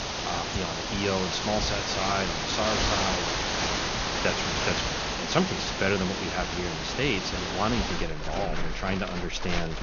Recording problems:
high frequencies cut off; noticeable; nothing above 6.5 kHz
animal sounds; very loud; throughout; 1 dB above the speech
crowd noise; very faint; throughout; 25 dB below the speech

